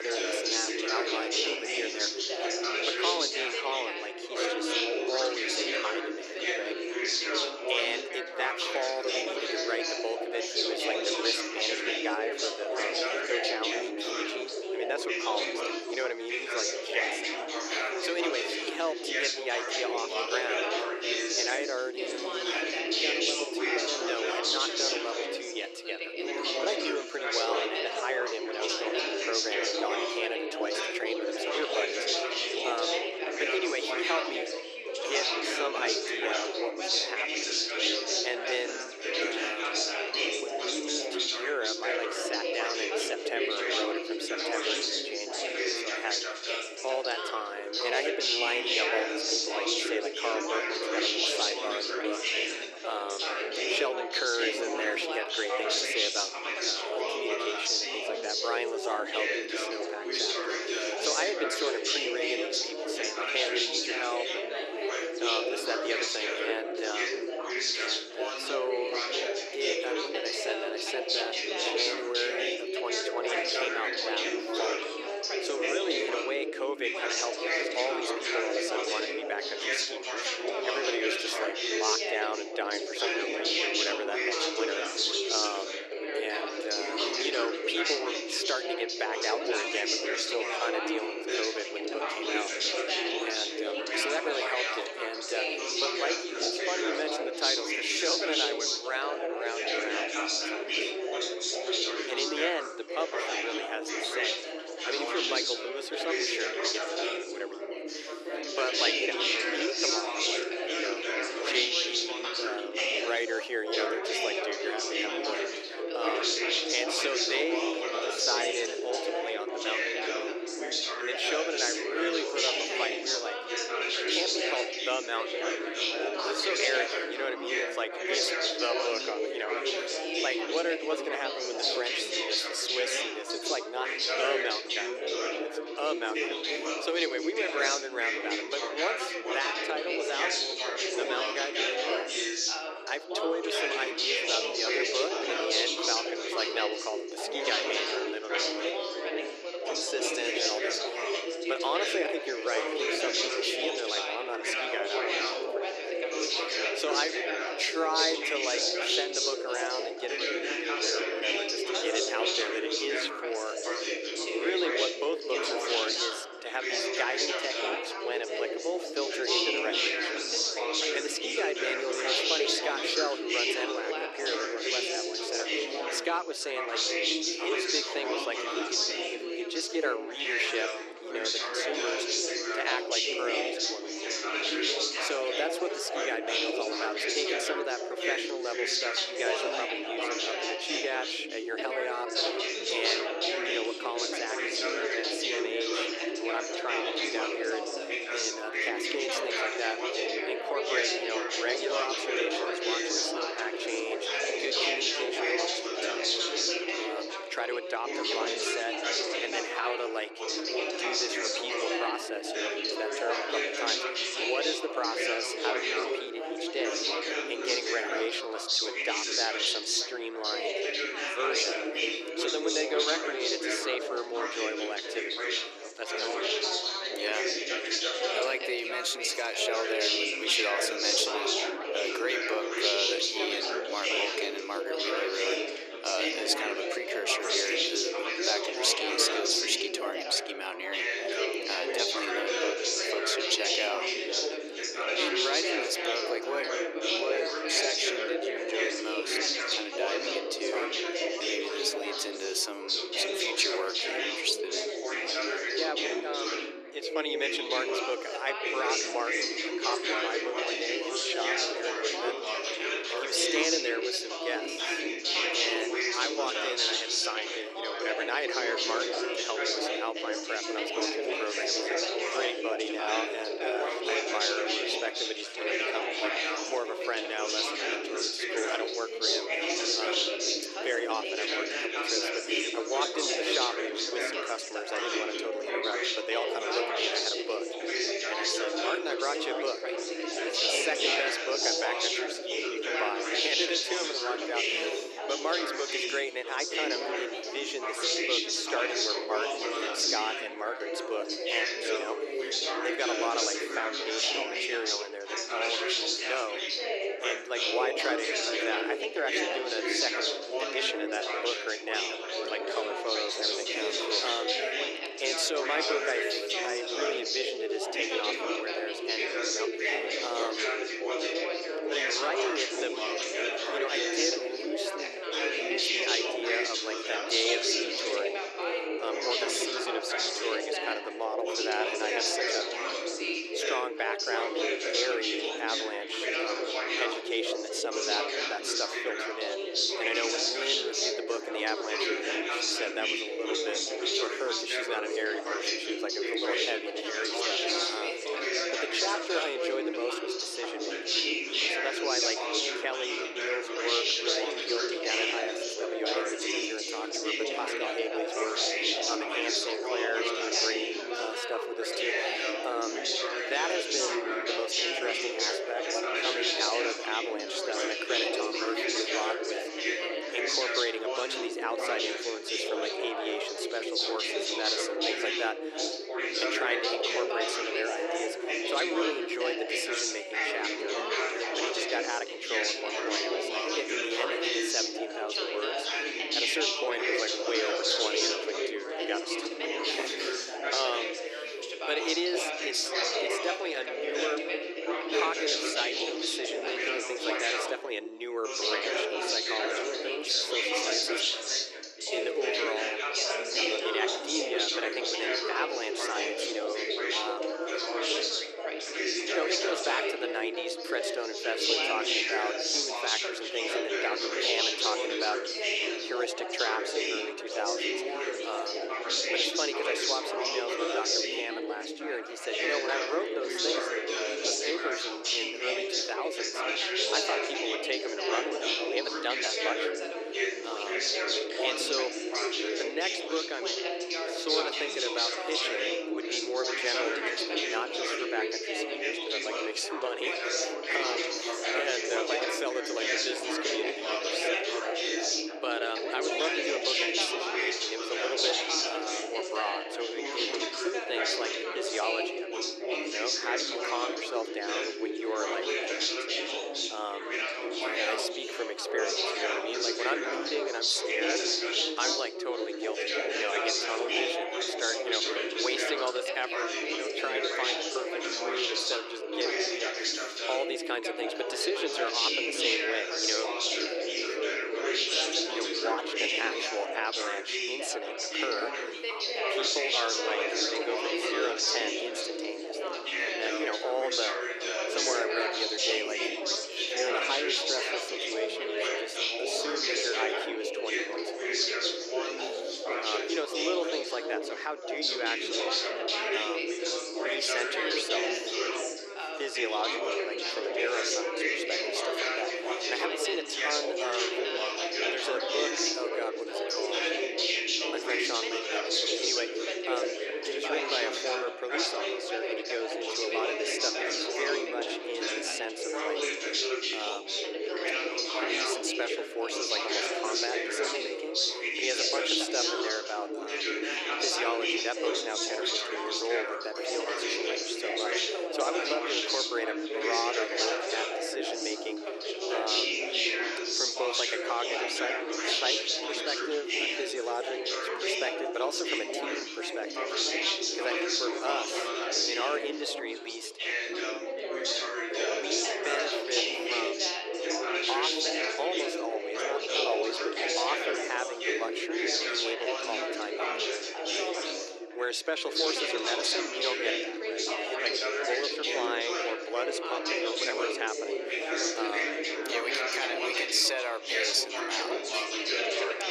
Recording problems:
thin; very; fading below 300 Hz
chatter from many people; very loud; throughout; 5 dB above the speech
abrupt cut into speech; at the start

